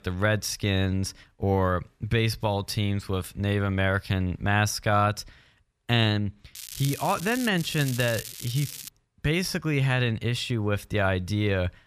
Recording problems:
crackling; noticeable; at 6.5 s and from 7.5 to 9 s; 10 dB below the speech

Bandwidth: 14.5 kHz